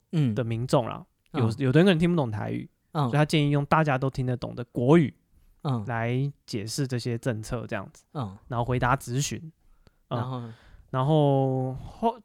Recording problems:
none

